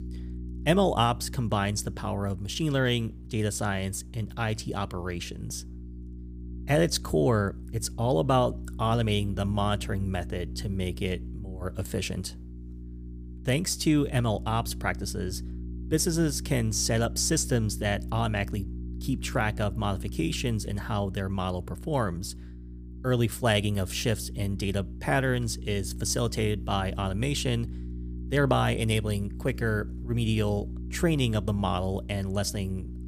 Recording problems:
electrical hum; noticeable; throughout; 60 Hz, 20 dB below the speech

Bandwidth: 15 kHz